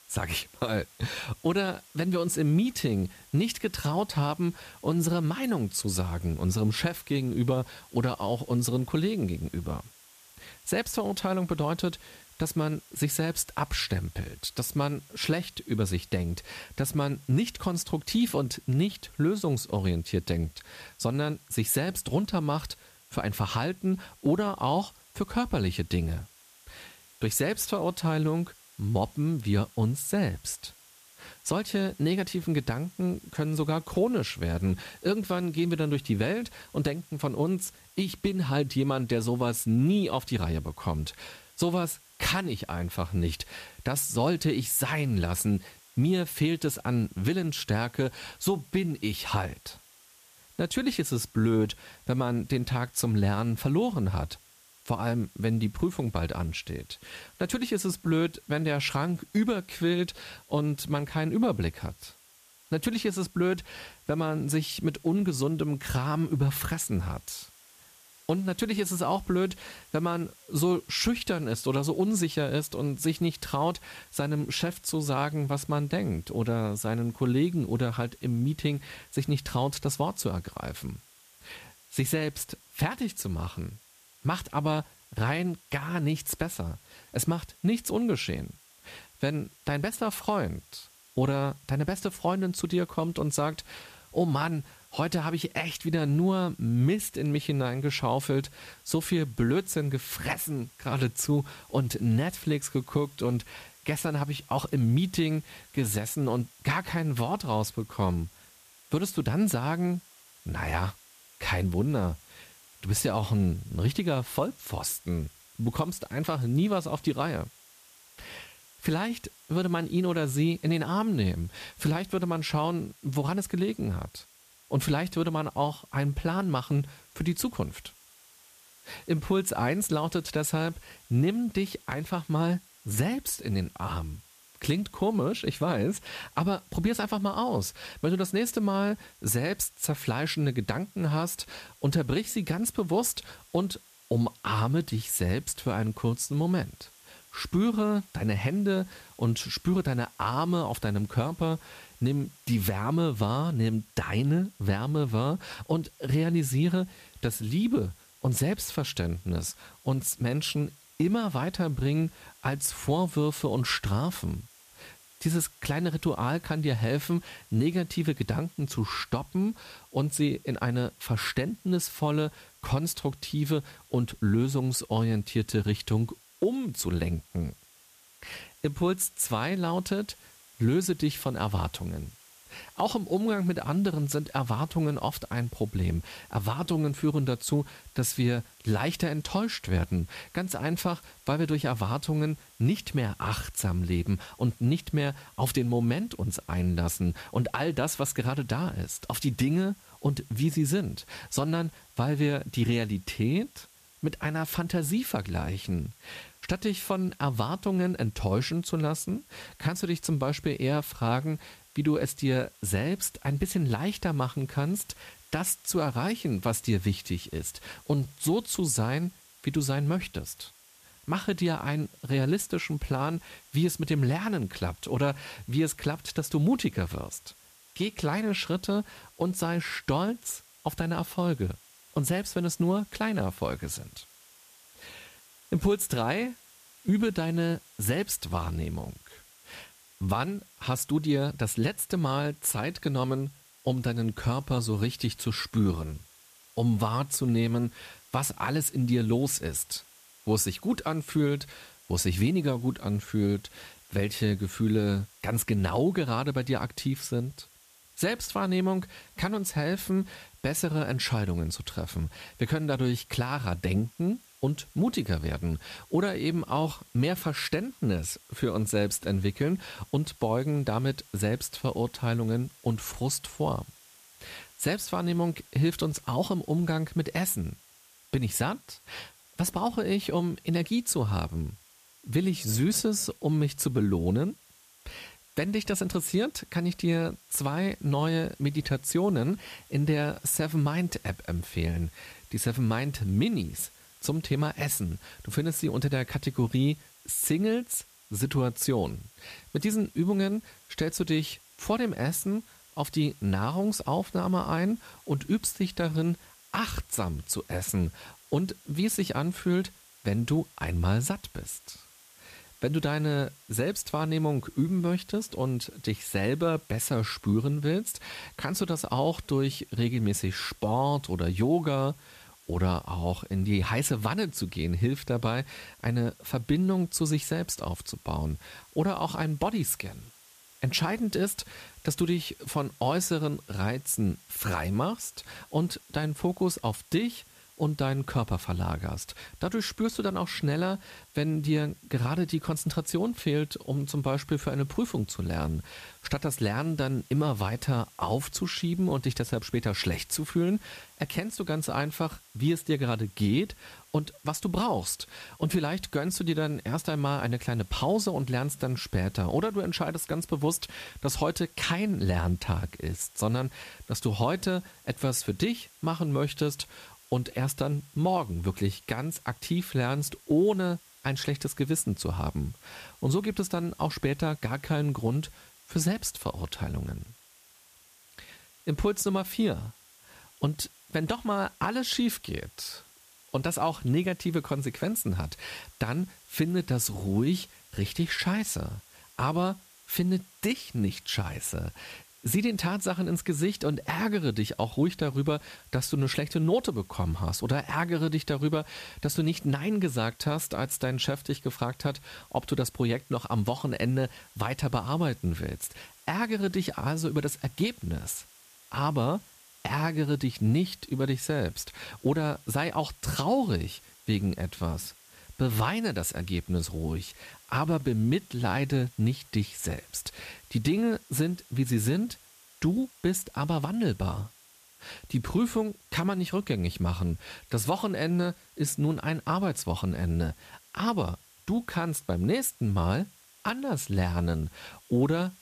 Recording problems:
hiss; faint; throughout; 25 dB below the speech

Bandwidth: 14.5 kHz